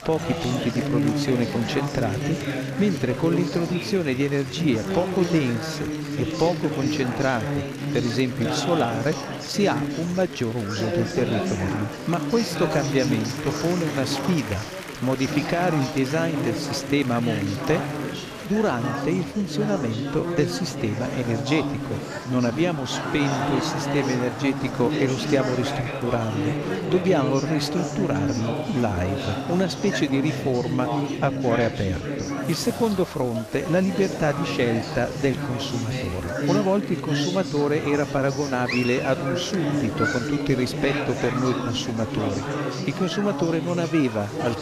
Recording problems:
chatter from many people; loud; throughout; 3 dB below the speech

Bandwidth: 14.5 kHz